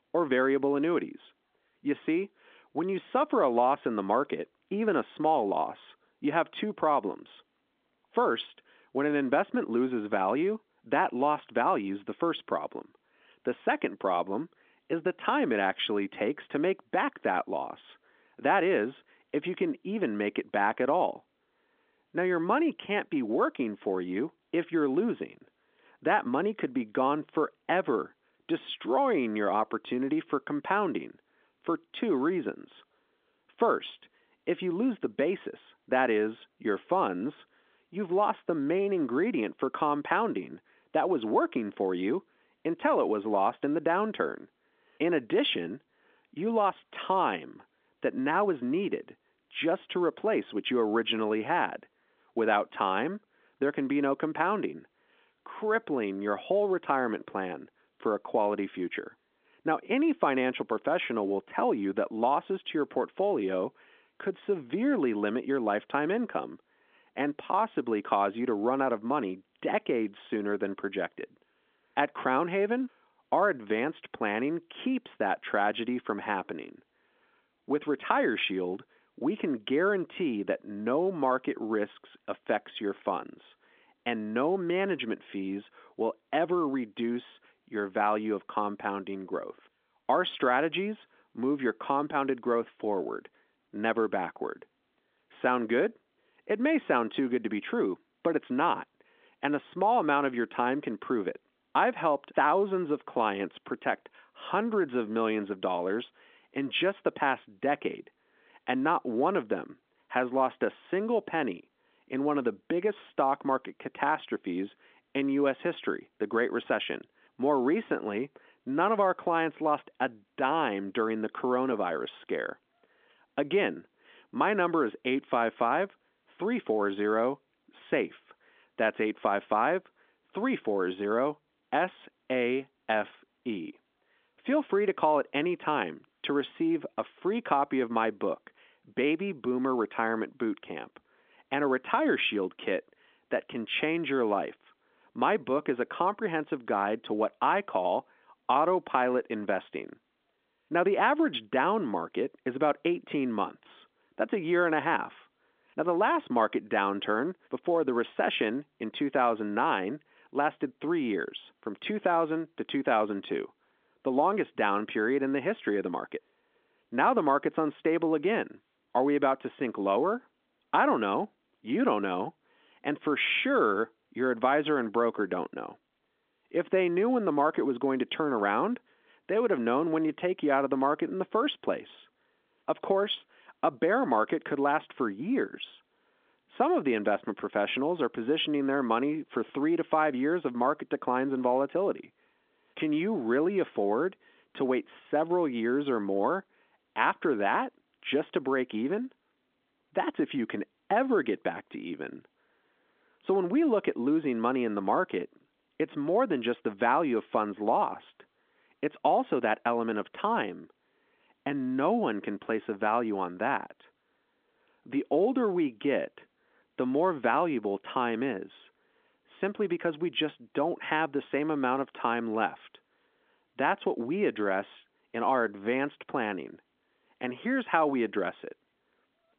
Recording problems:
phone-call audio; nothing above 3.5 kHz

